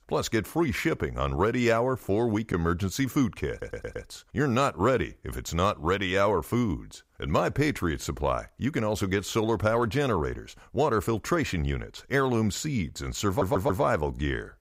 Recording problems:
audio stuttering; at 3.5 s and at 13 s

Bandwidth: 15.5 kHz